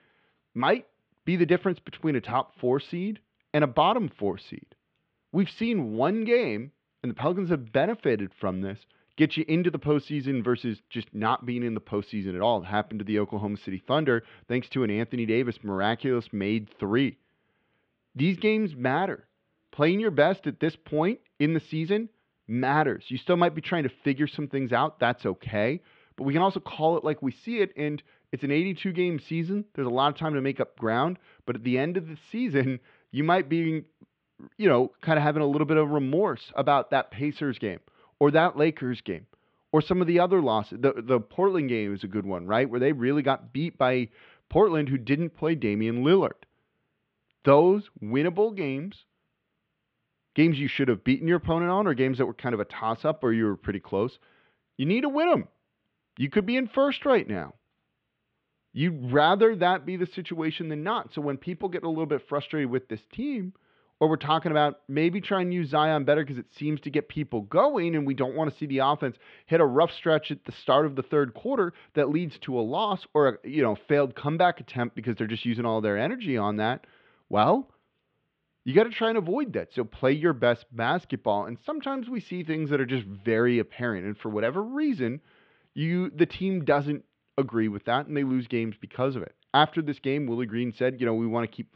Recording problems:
muffled; very; fading above 3.5 kHz

